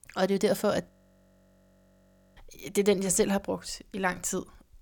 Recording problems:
audio freezing; at 1 s for 1.5 s

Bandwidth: 18 kHz